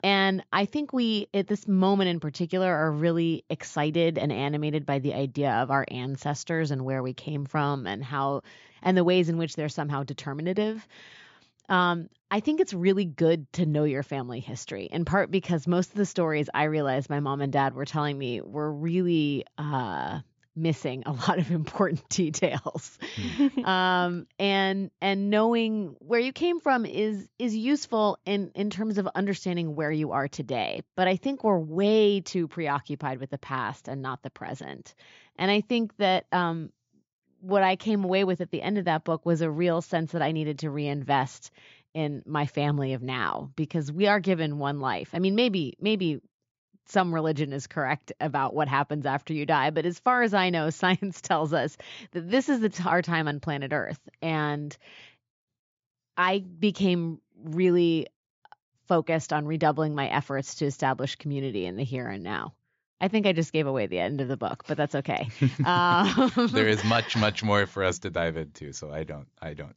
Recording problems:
high frequencies cut off; noticeable; nothing above 7.5 kHz

